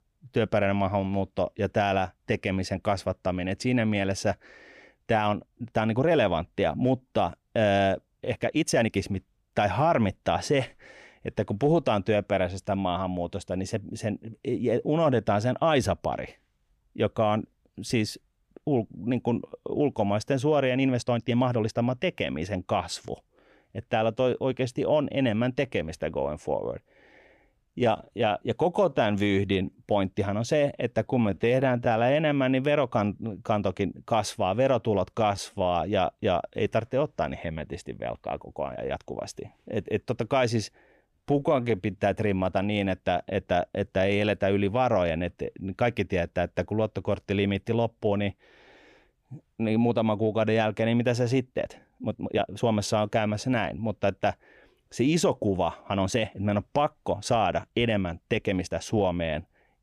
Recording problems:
uneven, jittery; strongly; from 5 to 59 s

